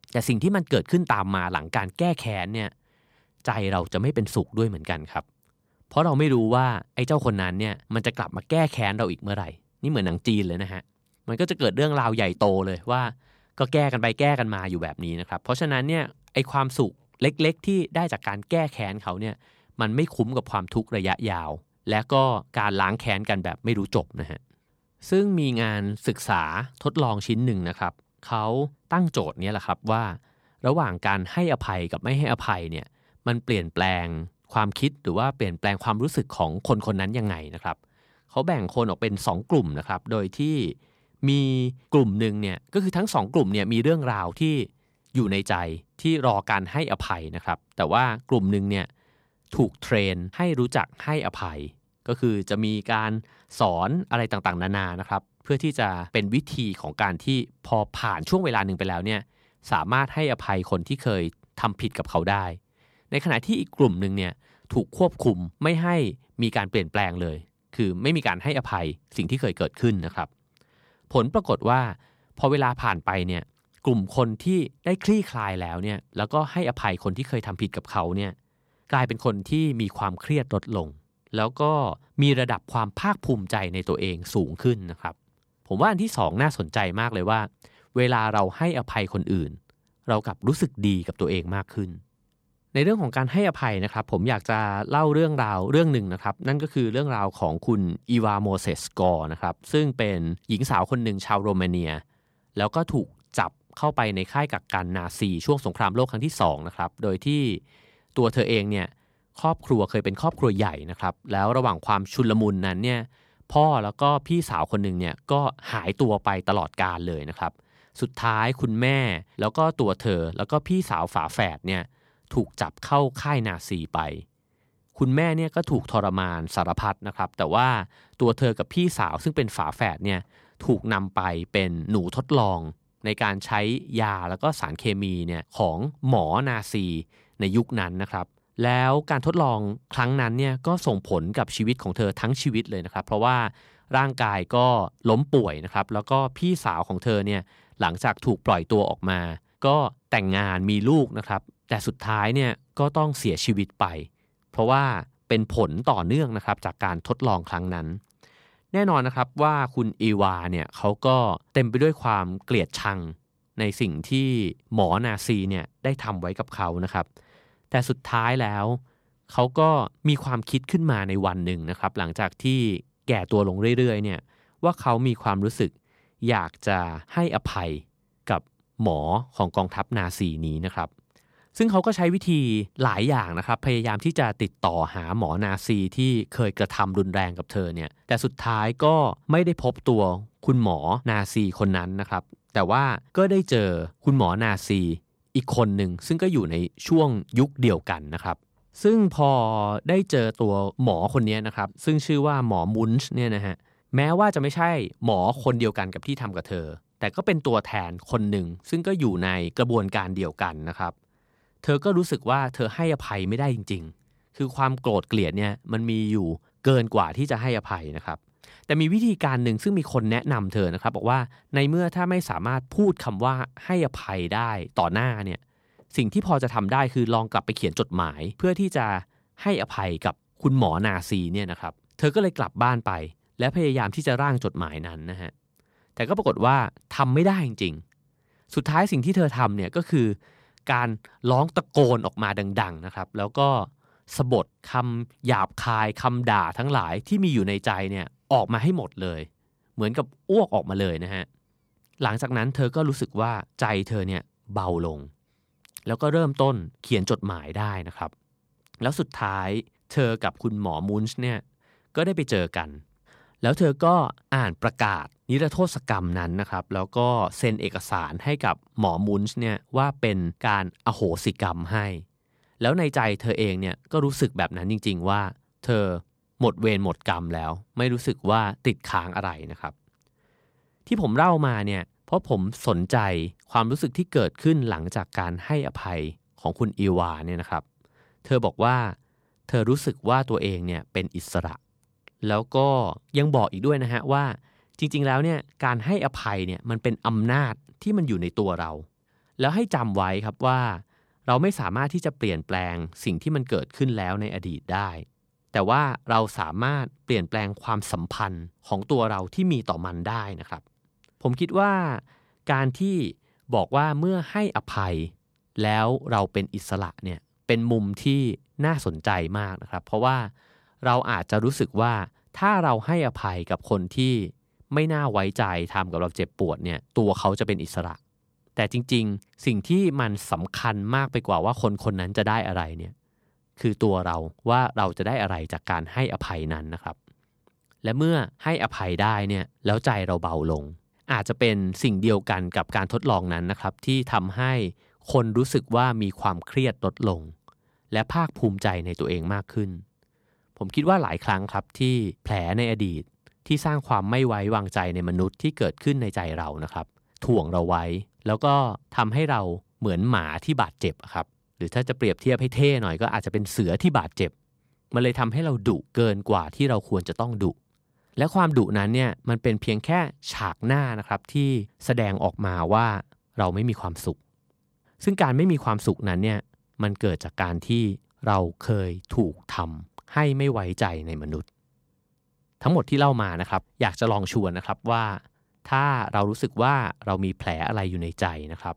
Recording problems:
none

